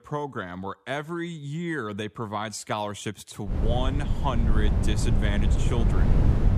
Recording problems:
wind noise on the microphone; heavy; from 3.5 s on; 4 dB below the speech

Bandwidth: 15 kHz